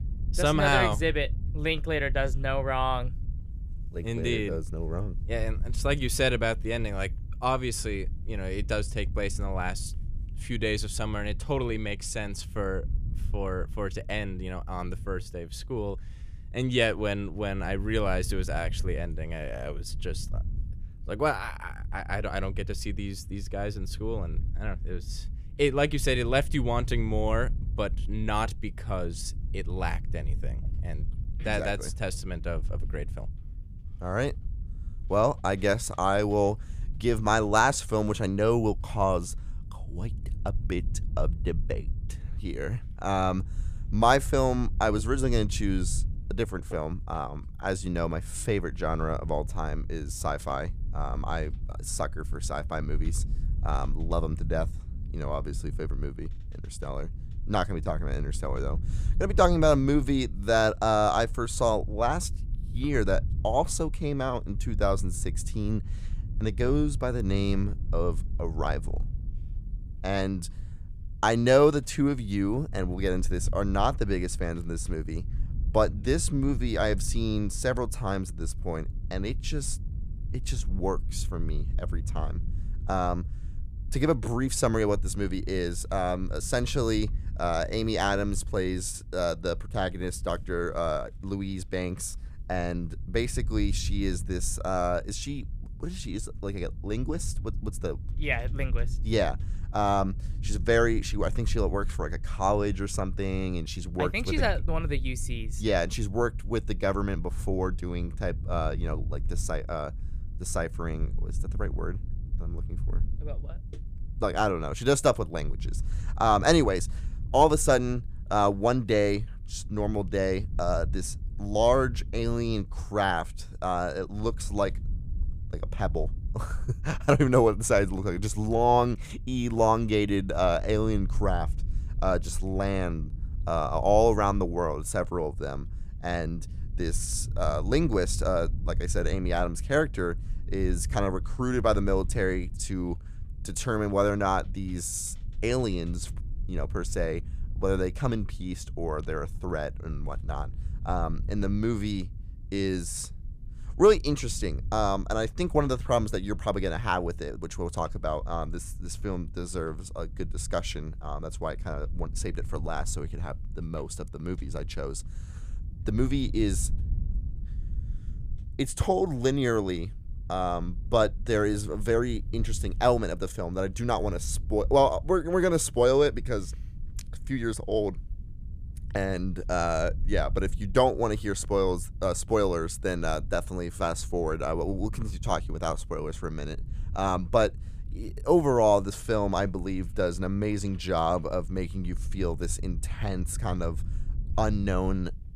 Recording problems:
low rumble; faint; throughout; 25 dB below the speech

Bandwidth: 14.5 kHz